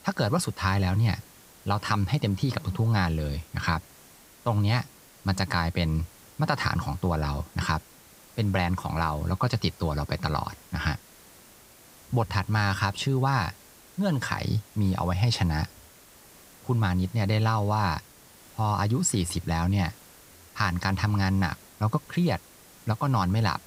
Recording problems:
hiss; faint; throughout; 25 dB below the speech

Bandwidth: 15.5 kHz